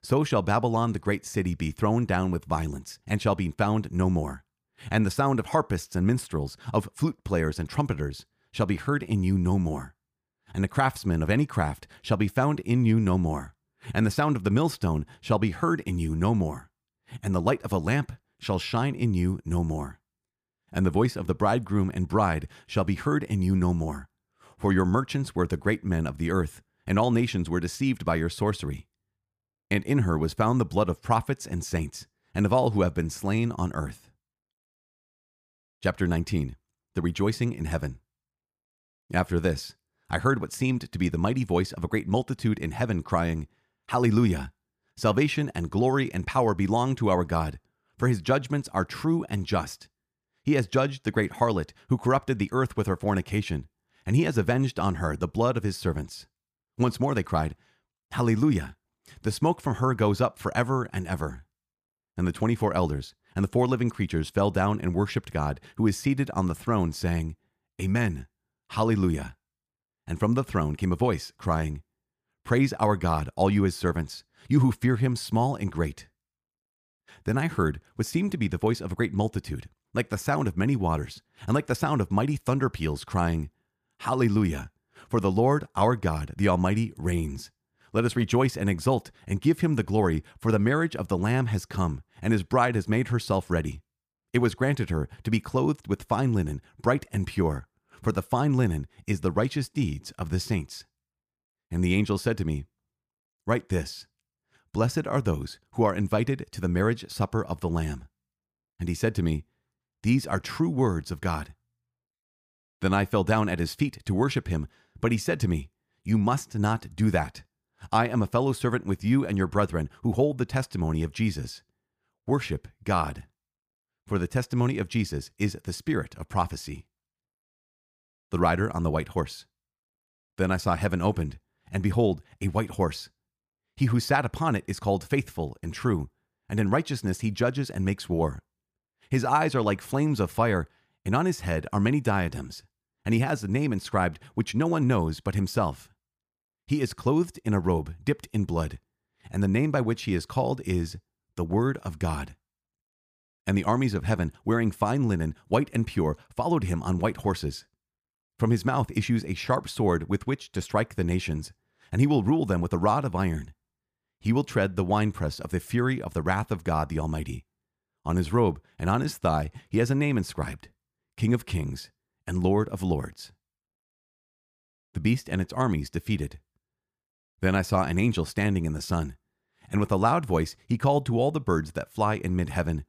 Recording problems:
none

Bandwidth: 15 kHz